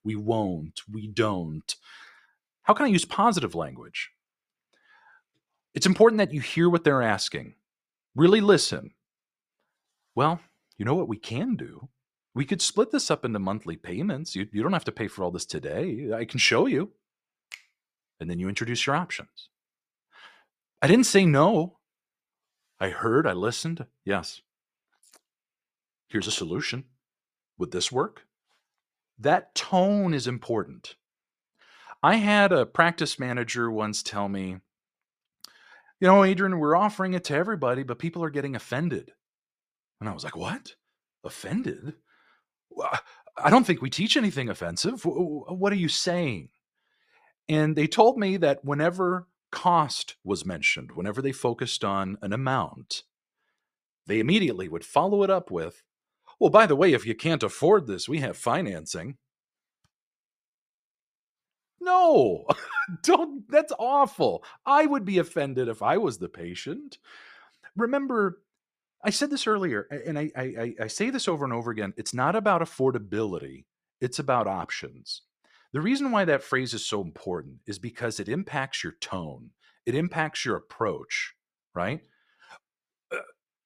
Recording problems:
none

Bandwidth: 14.5 kHz